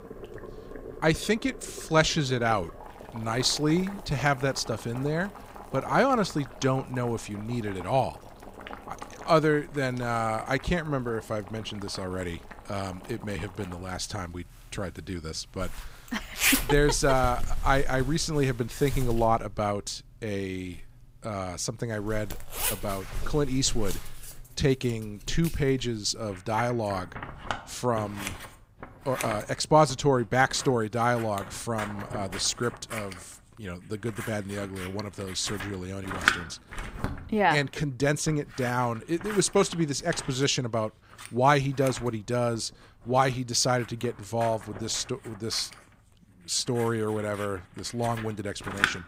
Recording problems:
household noises; loud; throughout; 9 dB below the speech

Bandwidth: 15.5 kHz